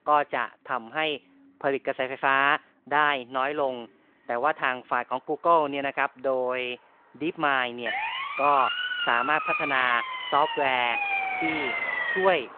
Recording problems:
phone-call audio
traffic noise; noticeable; throughout; 15 dB below the speech
siren; loud; from 8 s on; peak level with the speech

